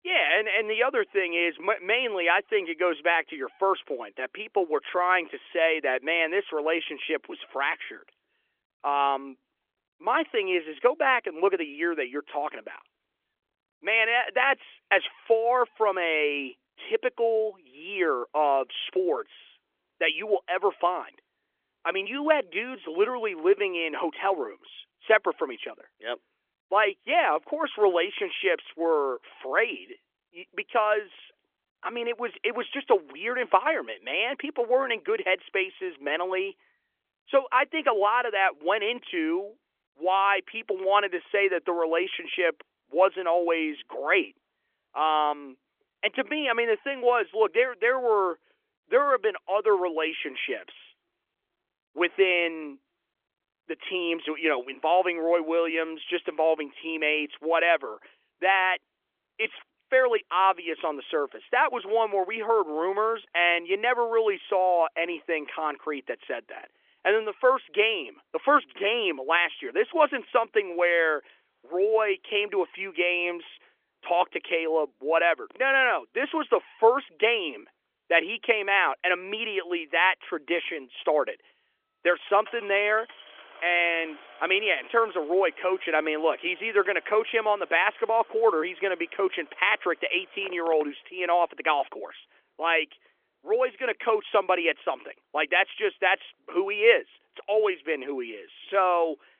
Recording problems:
phone-call audio; nothing above 3.5 kHz
traffic noise; faint; throughout; 25 dB below the speech

